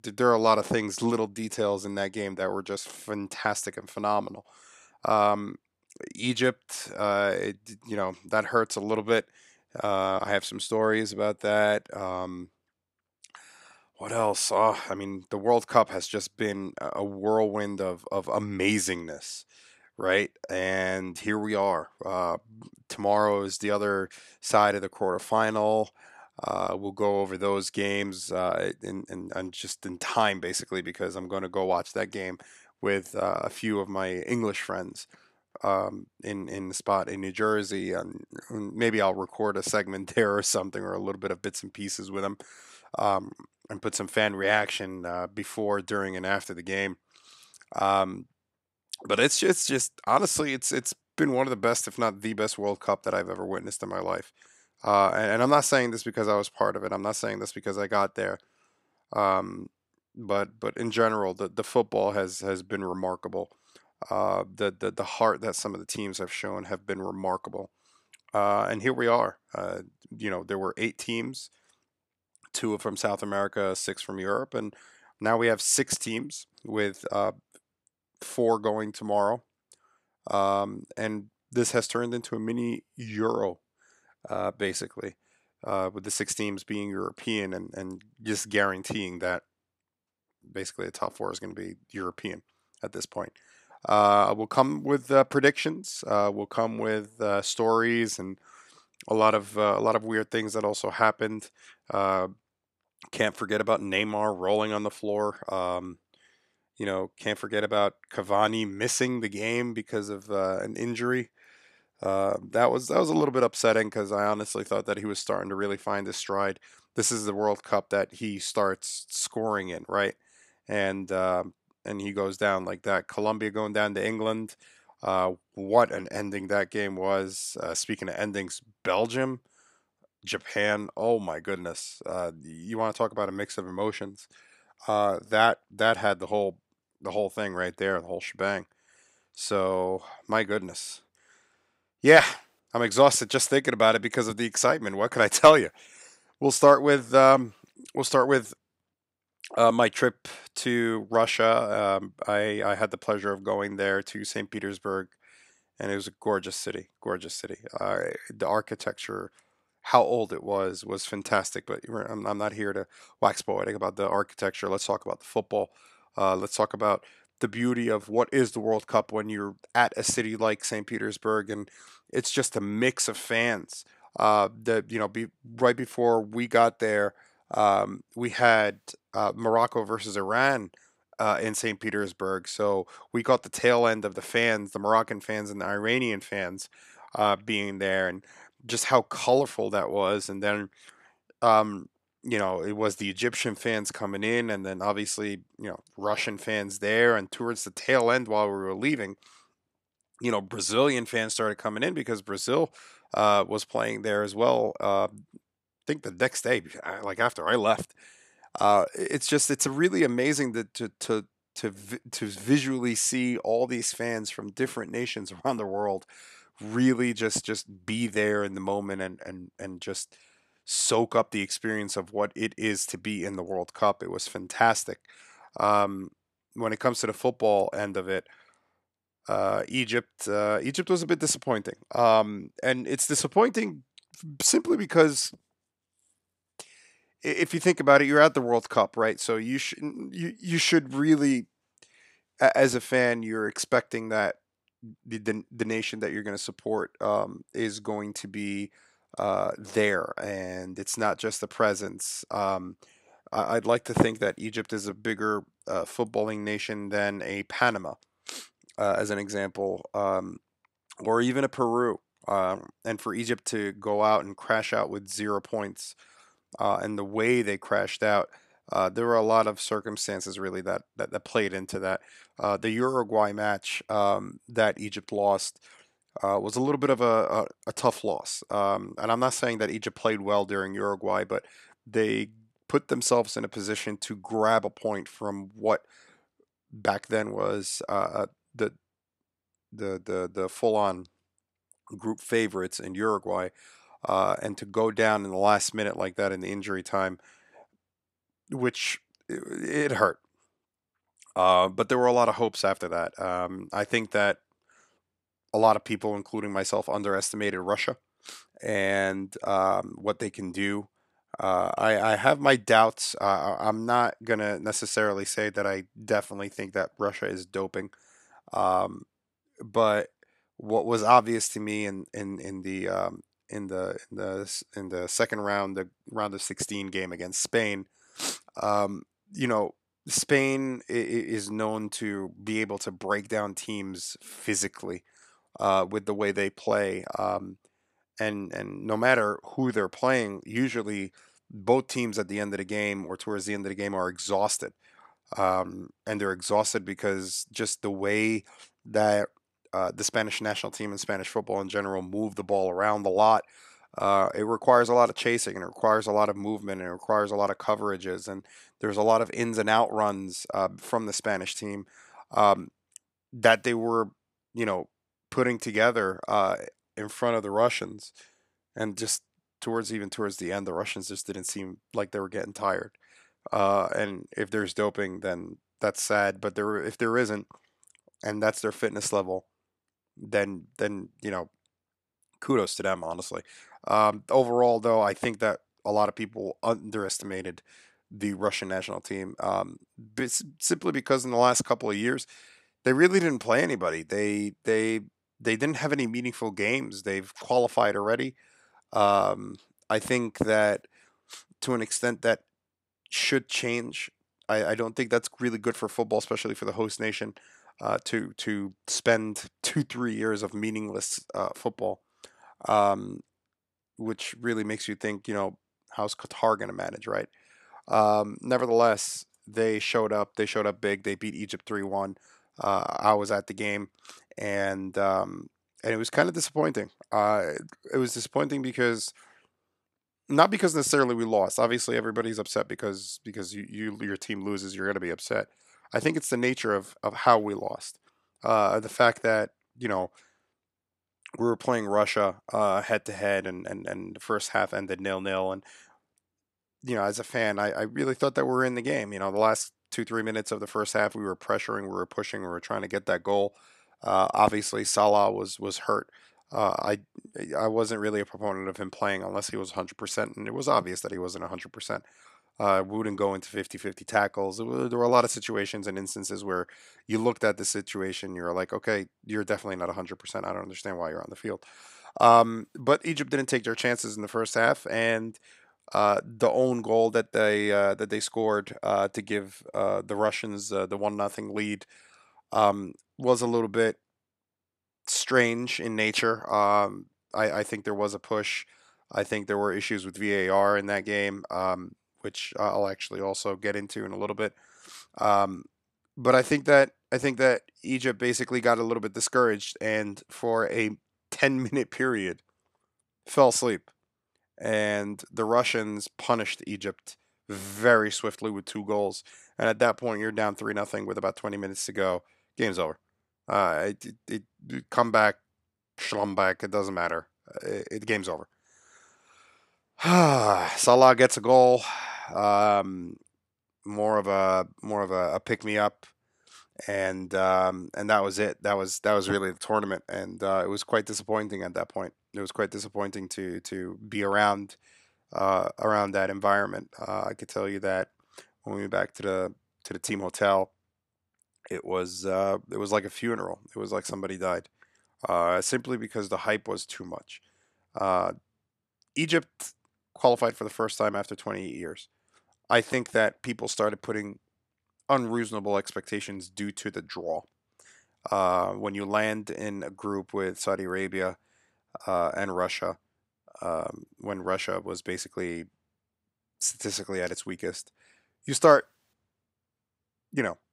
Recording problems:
none

